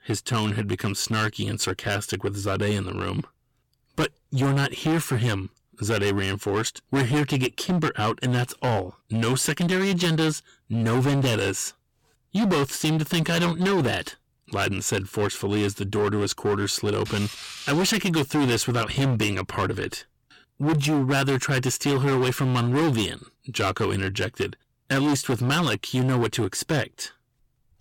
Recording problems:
distortion; heavy; 17% of the sound clipped

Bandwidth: 17 kHz